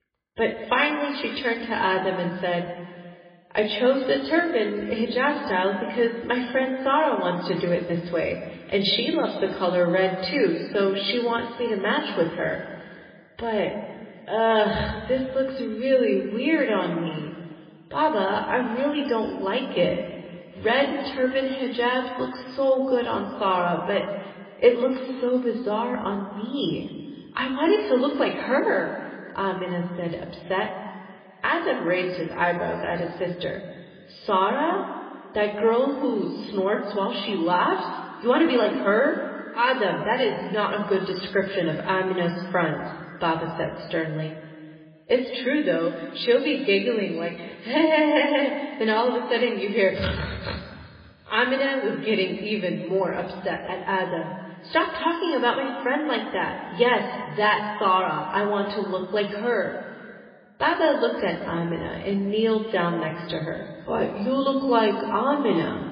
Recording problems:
garbled, watery; badly; nothing above 4.5 kHz
room echo; noticeable; dies away in 1.8 s
off-mic speech; somewhat distant

